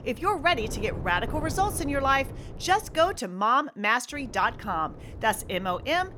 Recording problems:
wind noise on the microphone; occasional gusts; until 3 s and from 4 s on; 20 dB below the speech

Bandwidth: 18.5 kHz